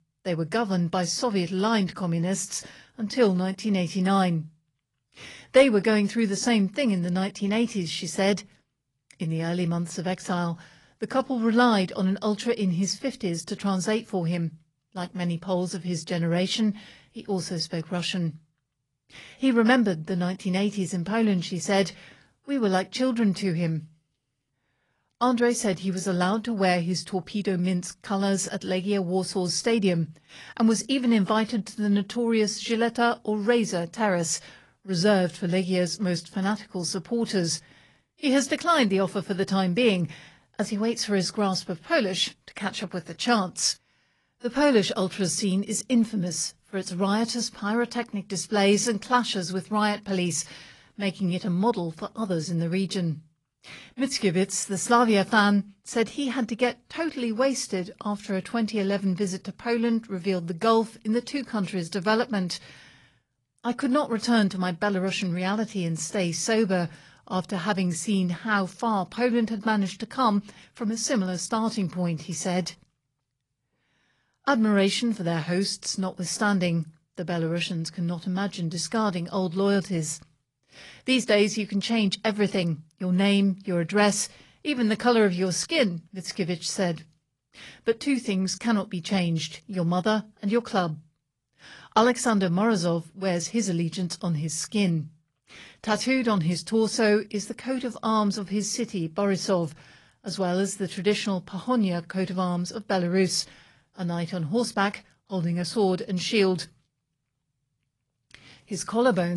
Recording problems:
garbled, watery; slightly; nothing above 10.5 kHz
abrupt cut into speech; at the end

